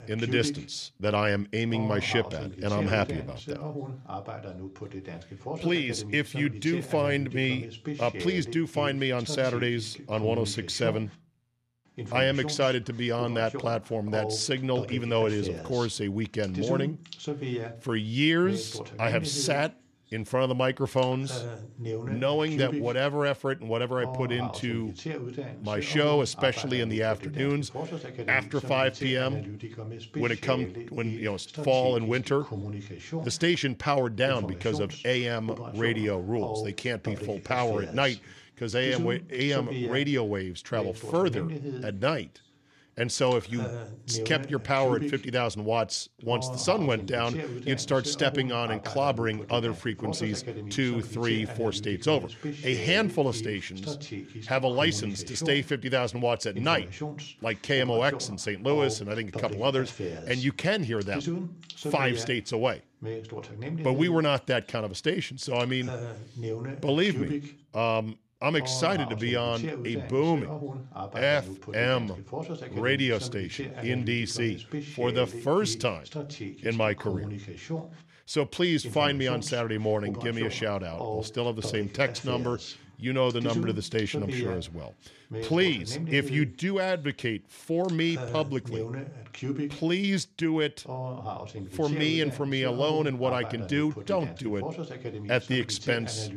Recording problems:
voice in the background; loud; throughout; 9 dB below the speech

